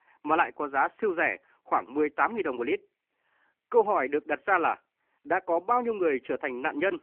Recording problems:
phone-call audio

